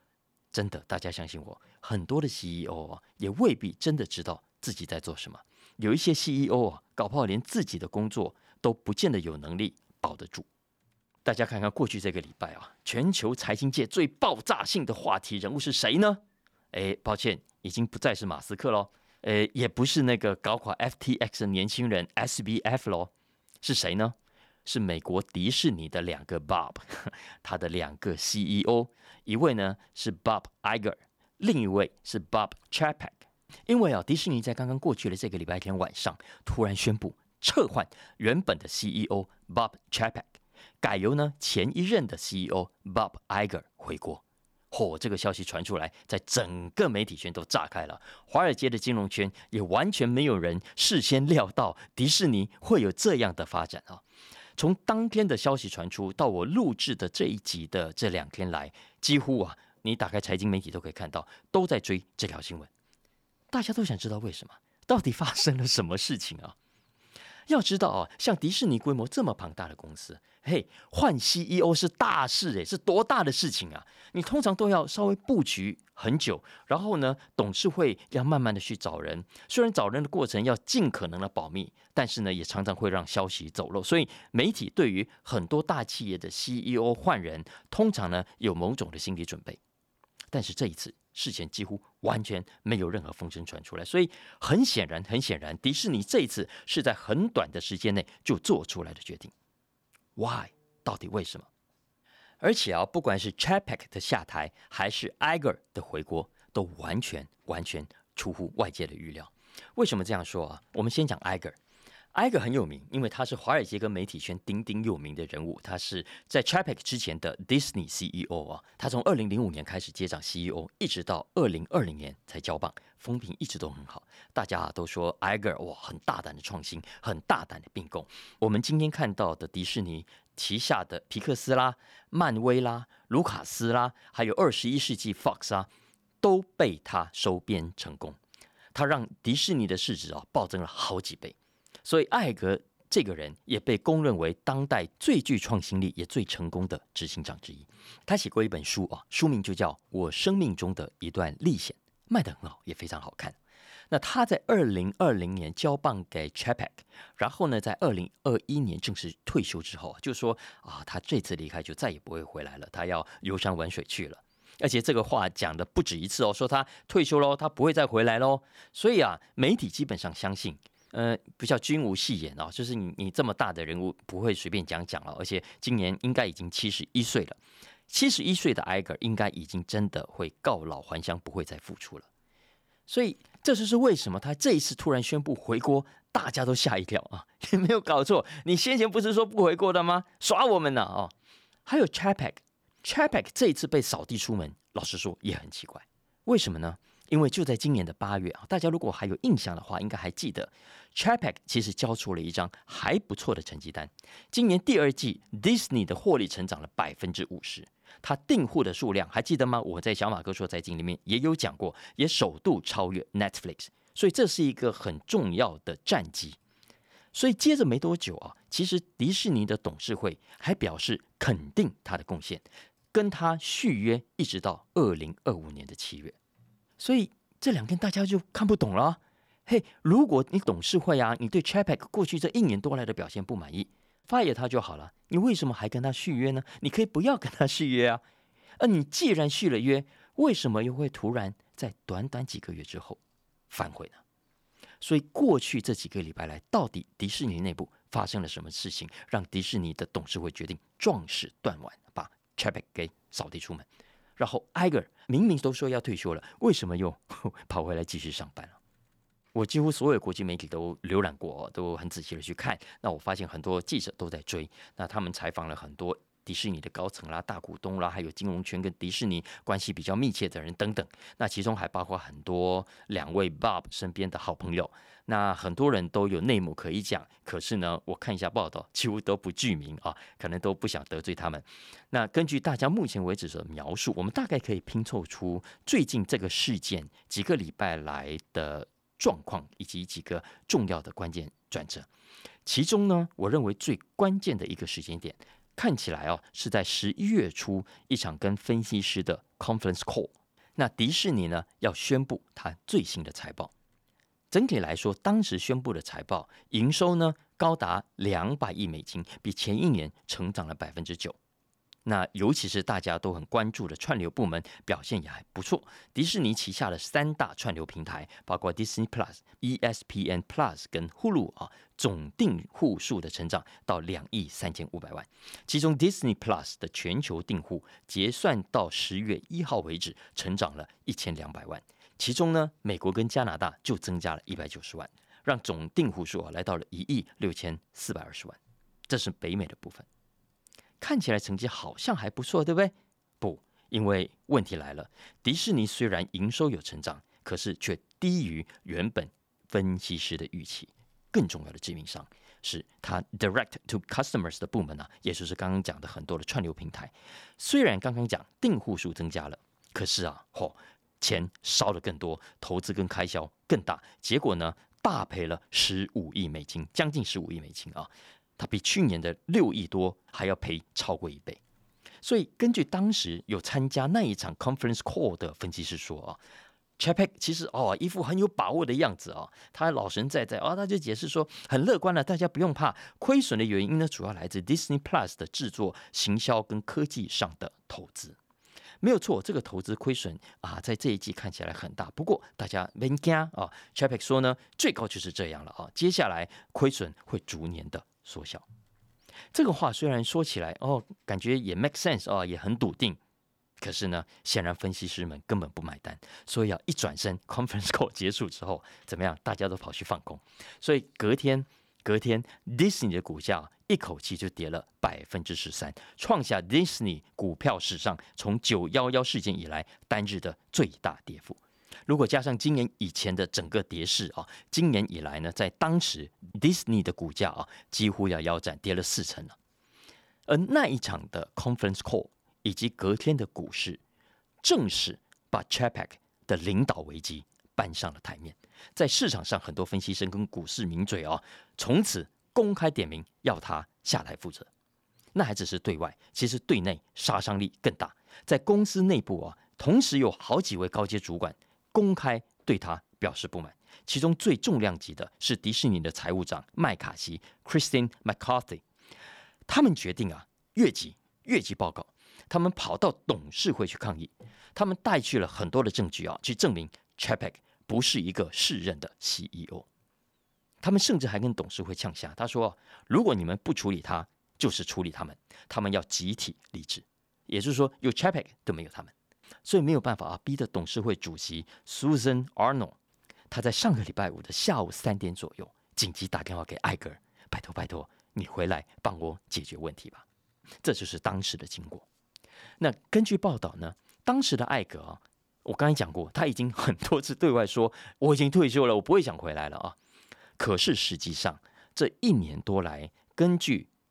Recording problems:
none

